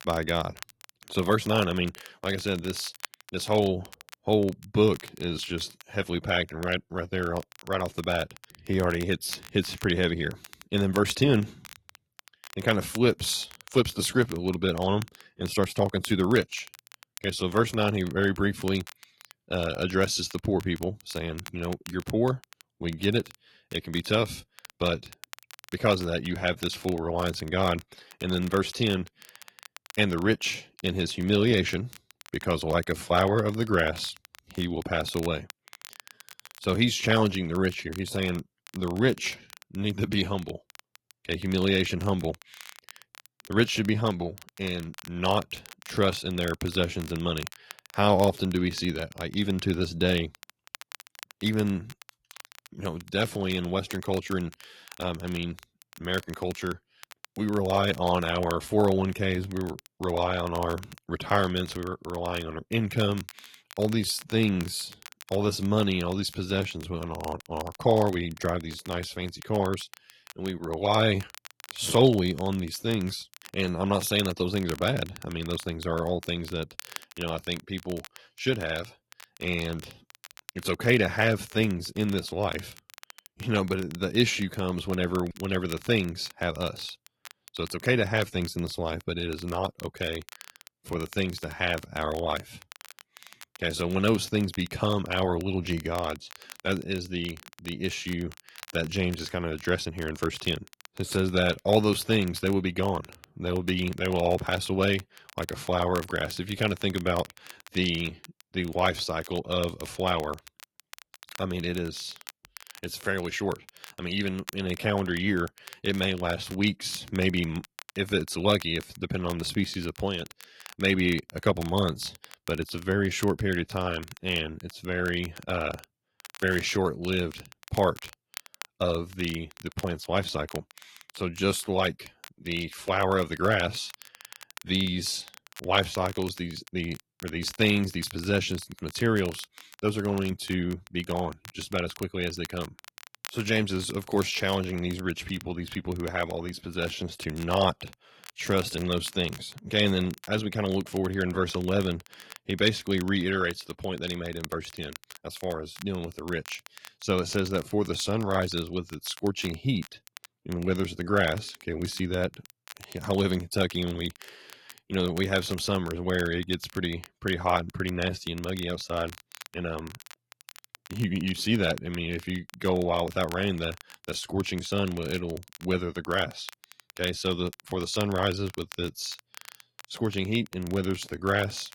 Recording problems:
garbled, watery; slightly
crackle, like an old record; noticeable; 20 dB below the speech

